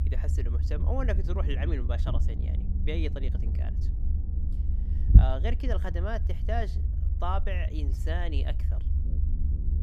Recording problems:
low rumble; loud; throughout; 9 dB below the speech

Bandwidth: 14.5 kHz